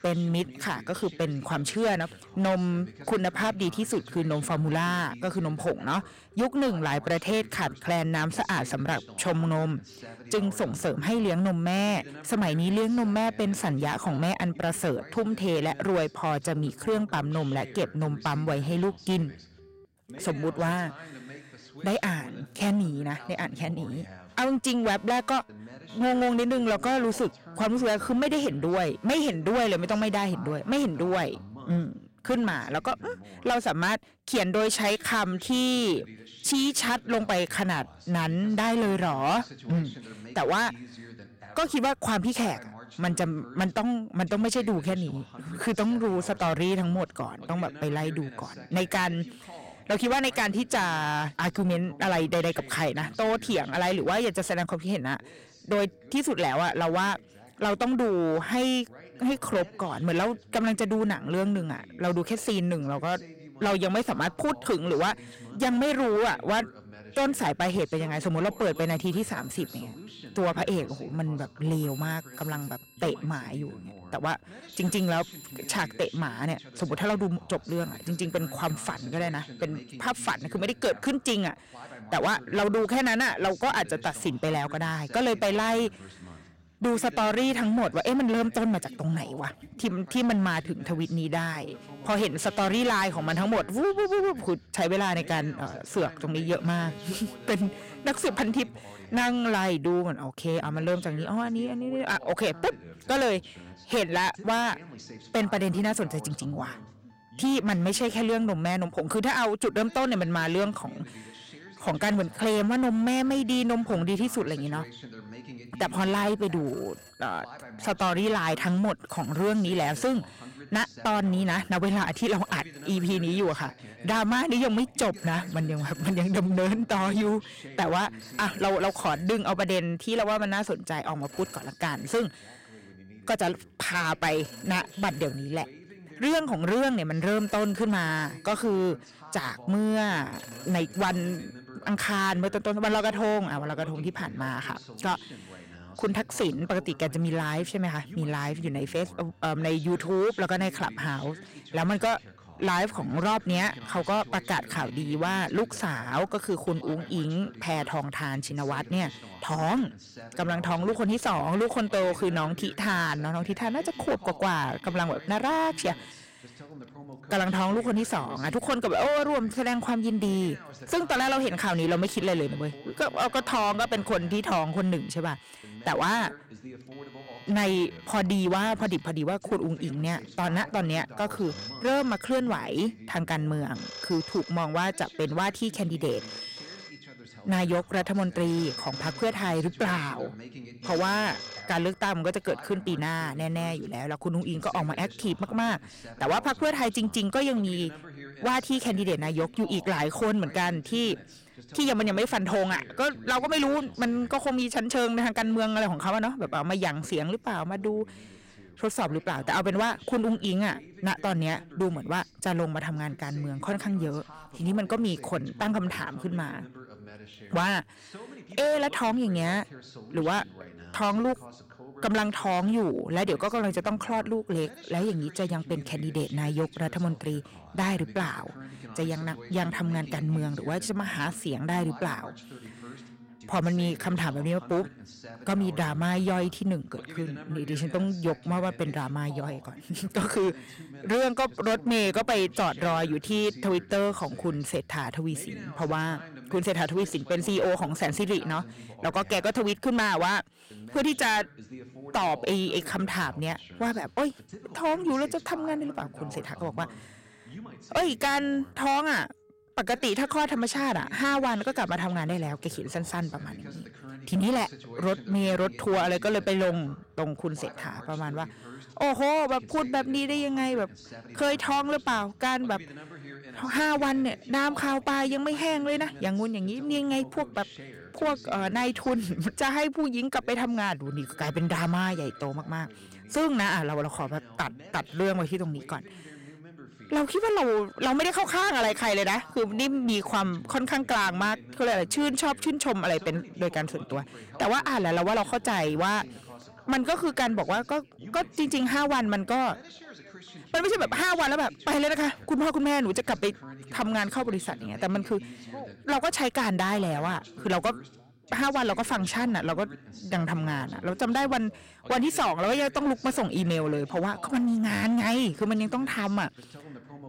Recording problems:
distortion; heavy; 11% of the sound clipped
voice in the background; noticeable; throughout; 20 dB below the speech
alarms or sirens; faint; throughout; 20 dB below the speech

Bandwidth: 16 kHz